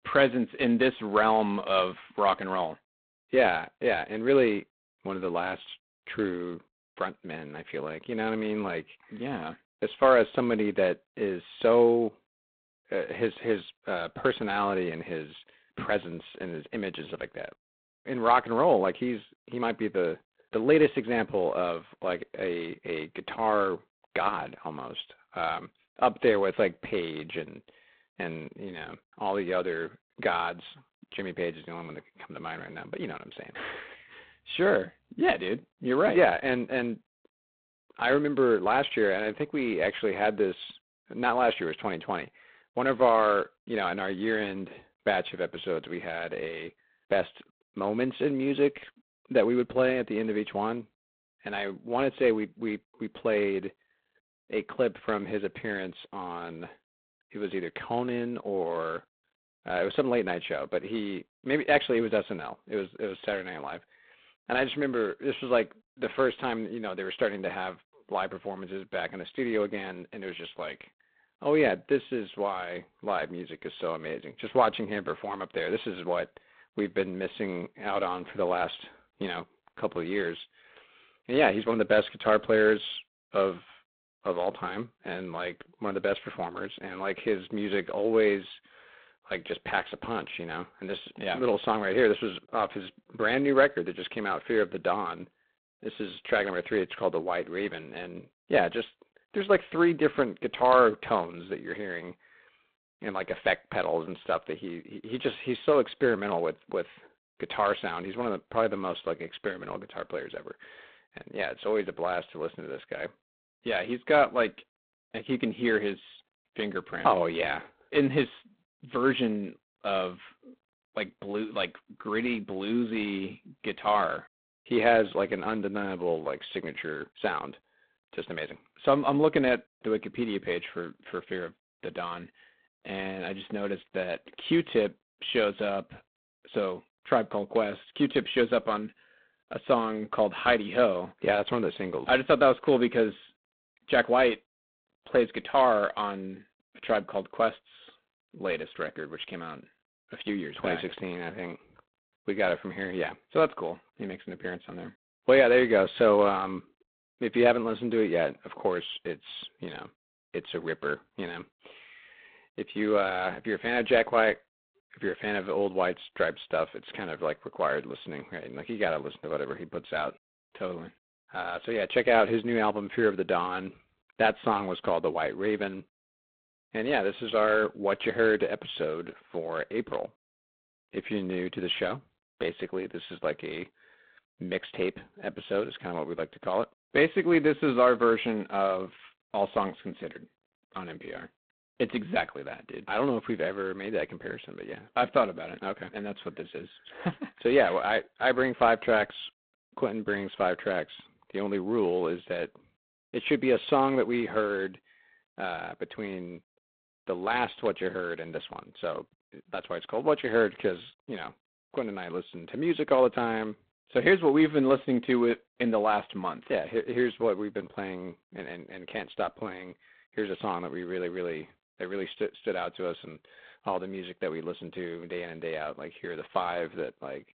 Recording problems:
phone-call audio; poor line; nothing above 4 kHz

